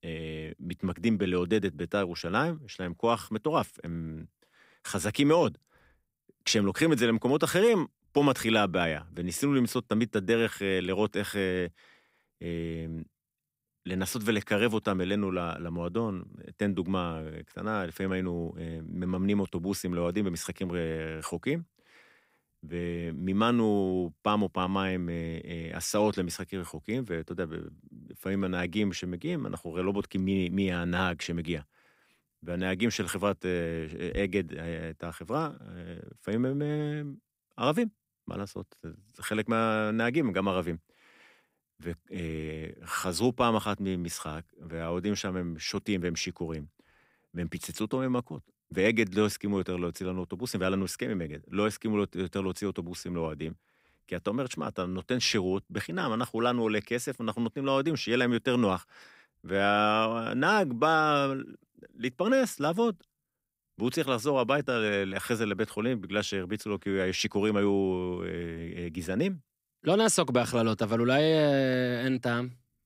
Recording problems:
none

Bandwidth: 15.5 kHz